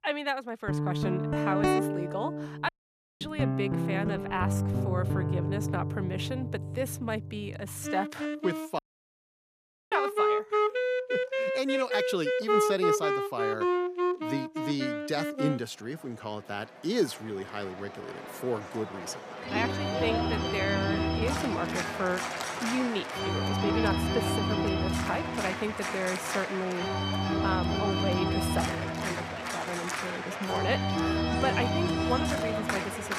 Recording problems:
background music; very loud; throughout; 4 dB above the speech
audio cutting out; at 2.5 s for 0.5 s and at 9 s for 1 s

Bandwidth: 15 kHz